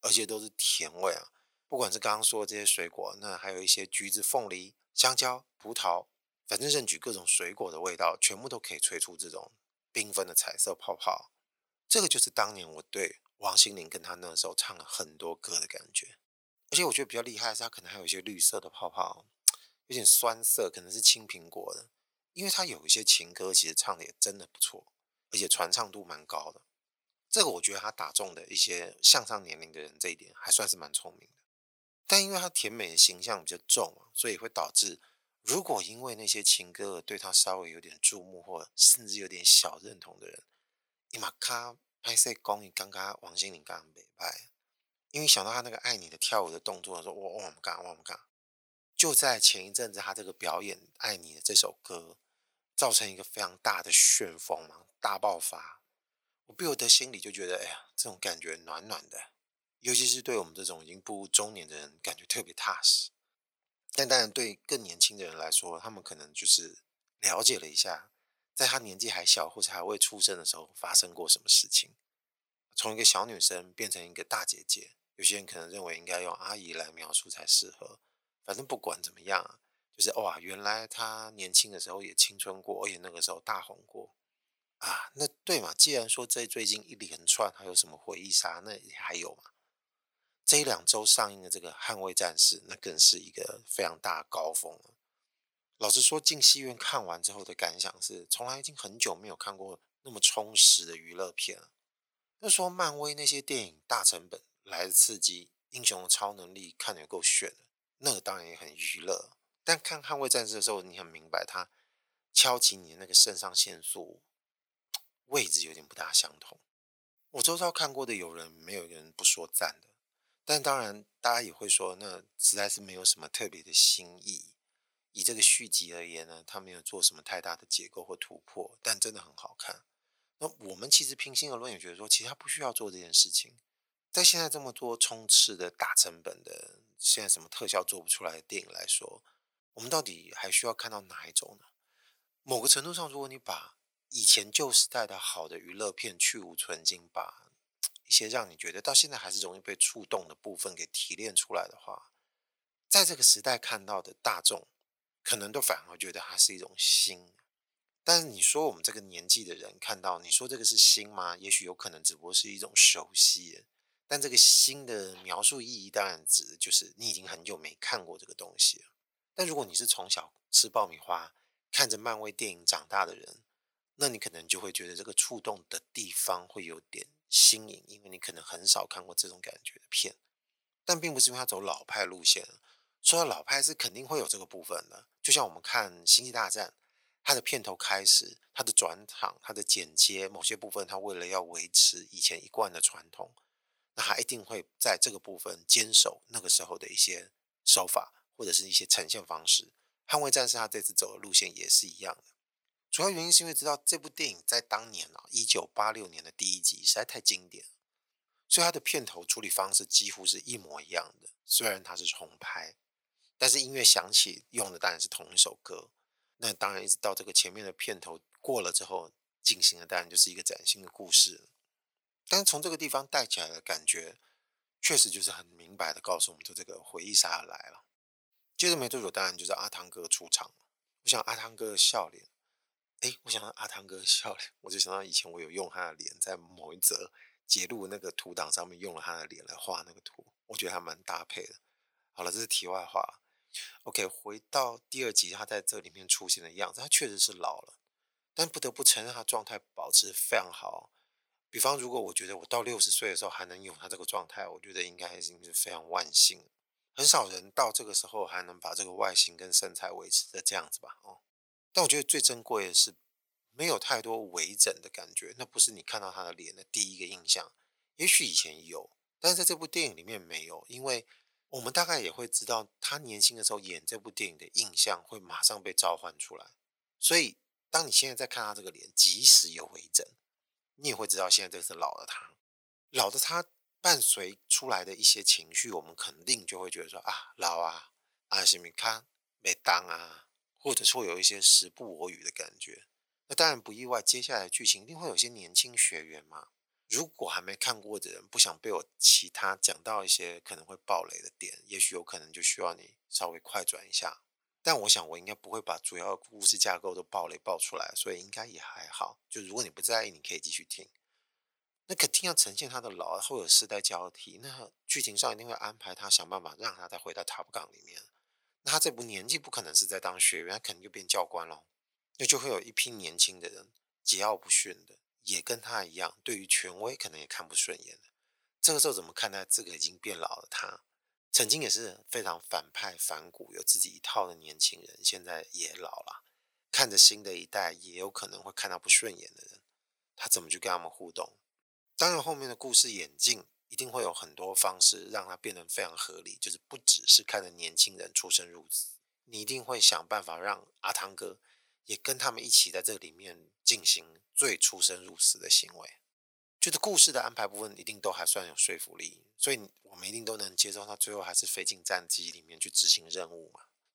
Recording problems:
thin; very; fading below 650 Hz

